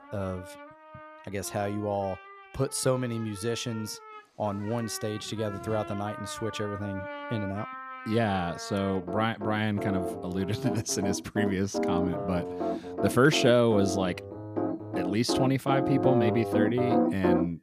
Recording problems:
background music; loud; throughout; 3 dB below the speech

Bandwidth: 14.5 kHz